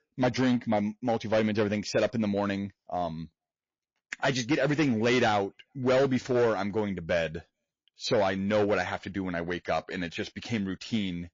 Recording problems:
distortion; slight; 6% of the sound clipped
garbled, watery; slightly; nothing above 6.5 kHz

